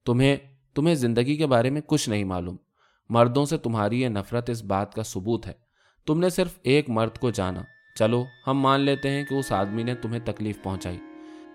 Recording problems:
background music; noticeable; from 7.5 s on; 20 dB below the speech

